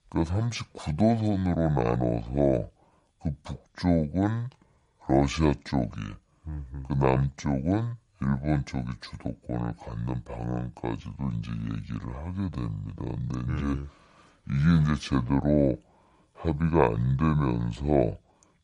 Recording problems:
wrong speed and pitch; too slow and too low; 0.7 times normal speed

